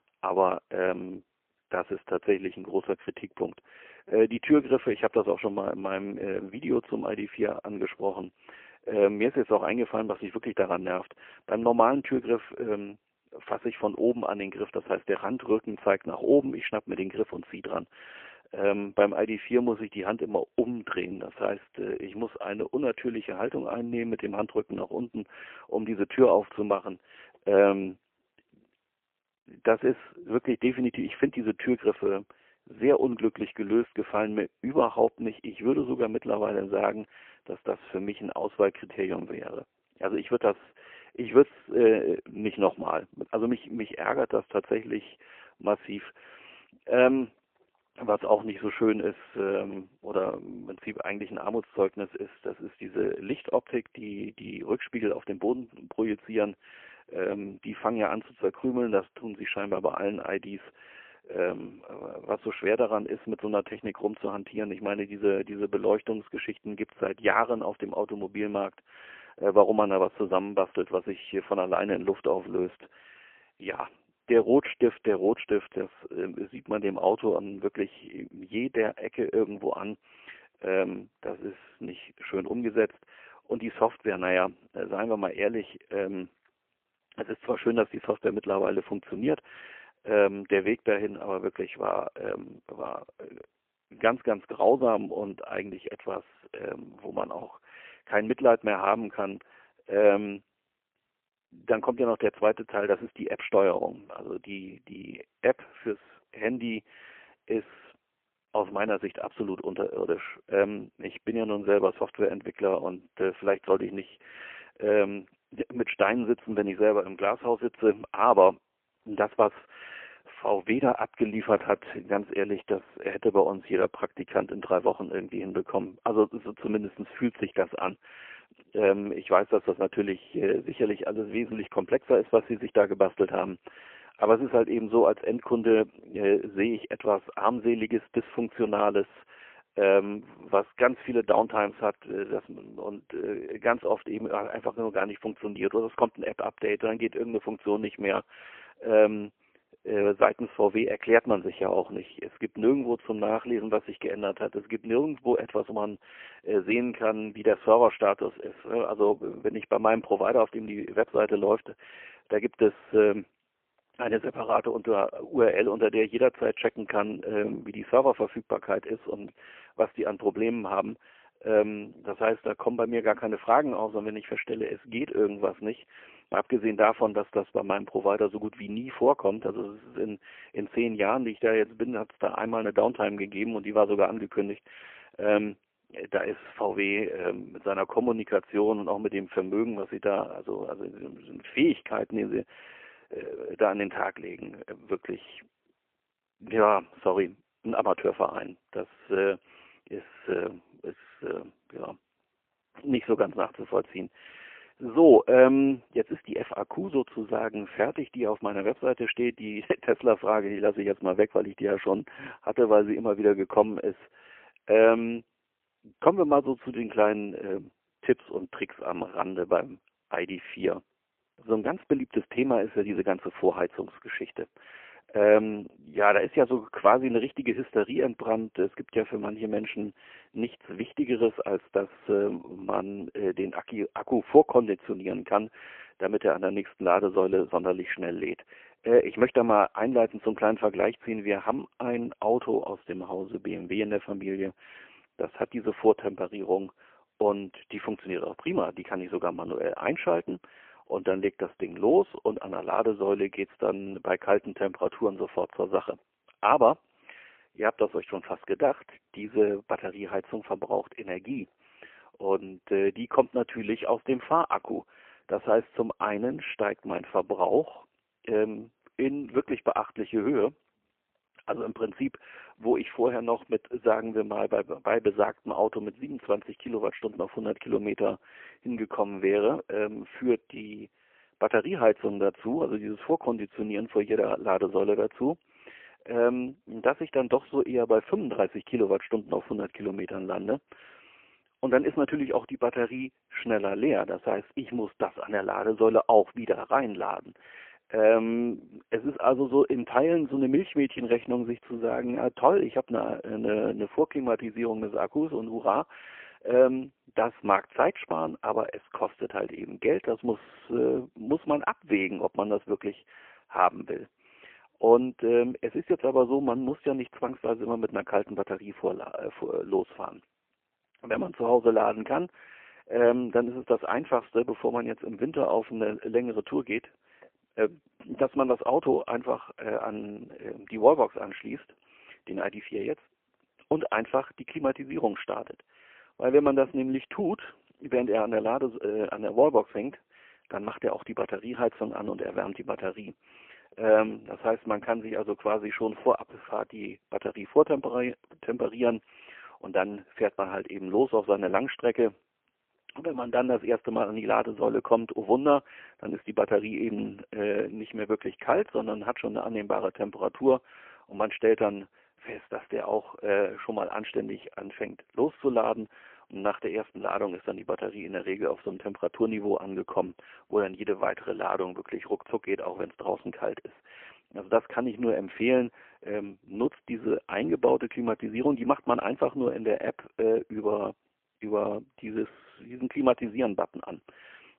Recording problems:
phone-call audio; poor line

